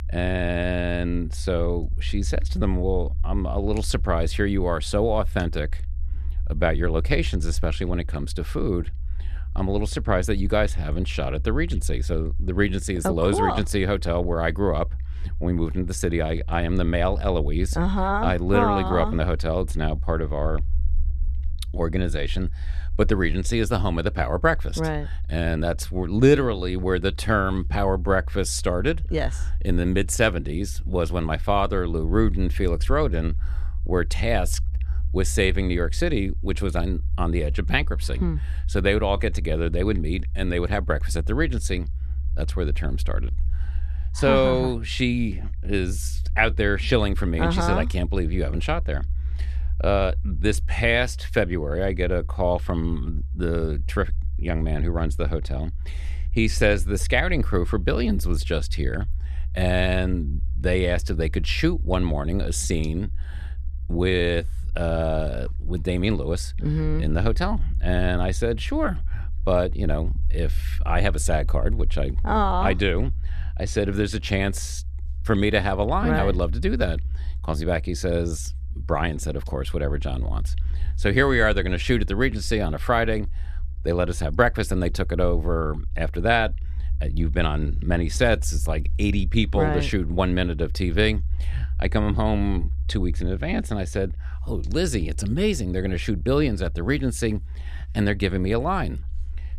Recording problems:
low rumble; faint; throughout; 25 dB below the speech

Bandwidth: 13.5 kHz